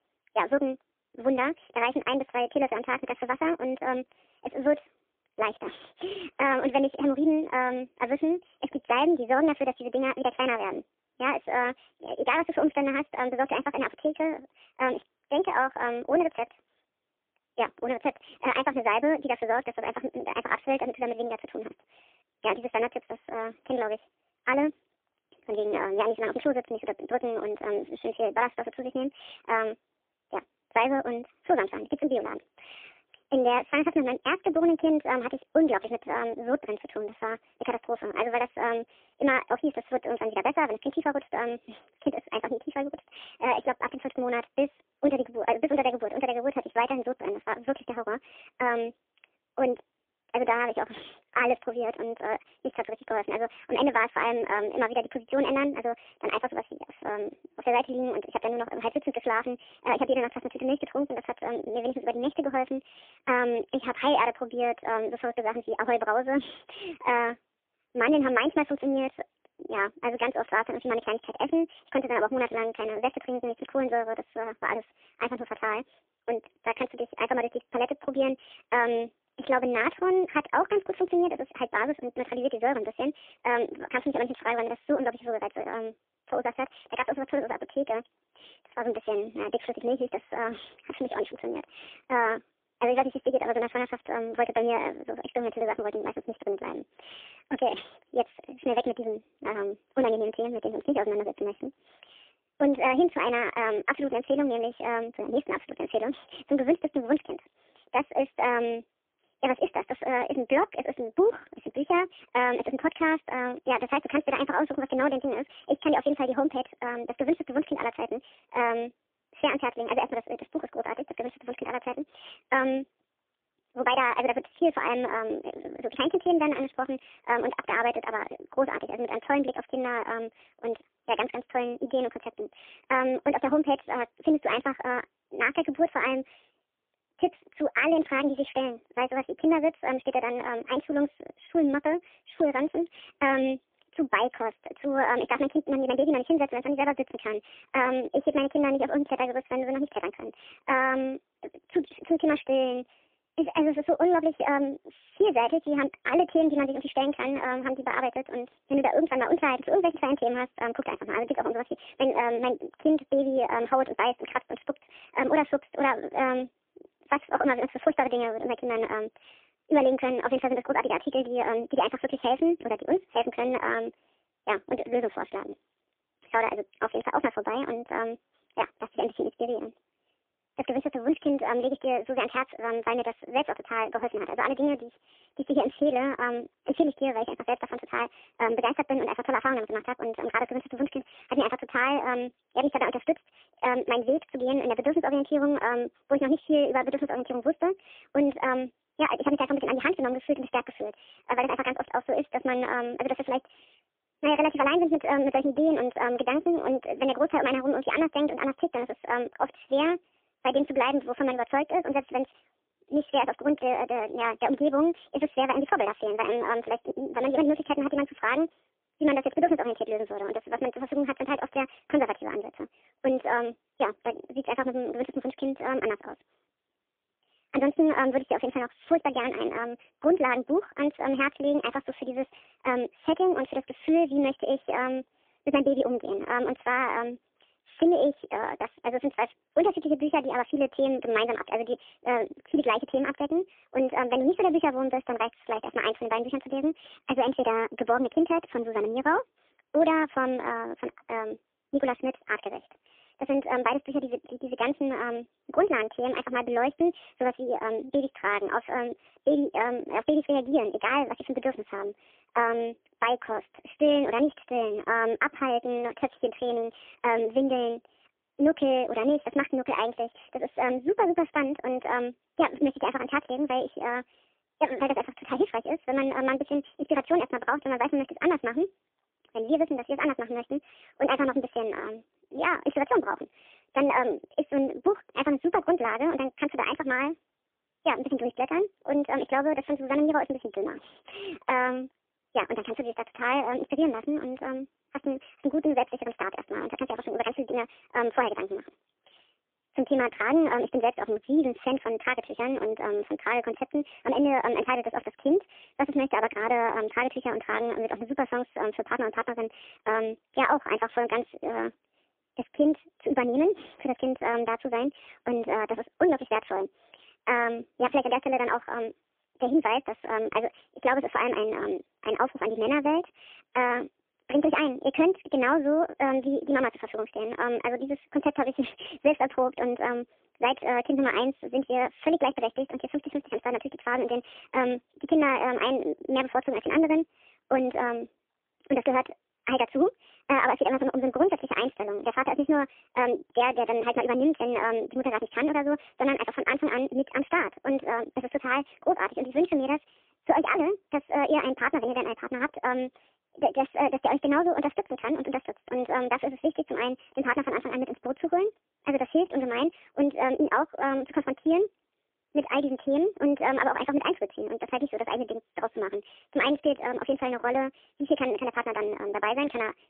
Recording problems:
phone-call audio; poor line; nothing above 3.5 kHz
wrong speed and pitch; too fast and too high; 1.5 times normal speed

